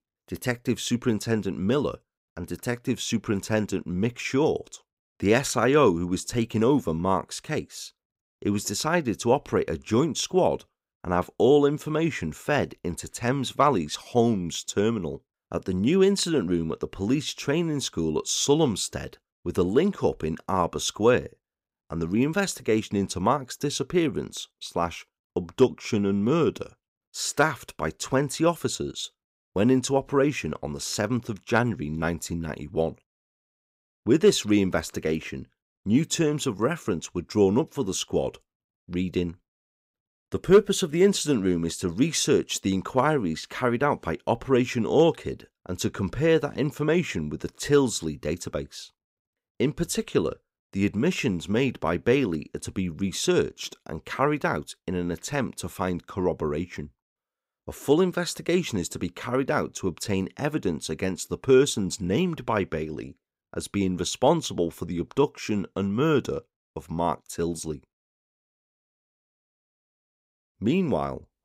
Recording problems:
none

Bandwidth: 15.5 kHz